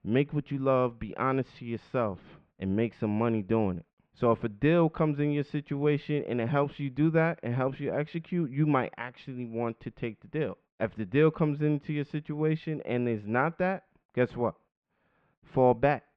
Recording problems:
muffled; very; fading above 3 kHz

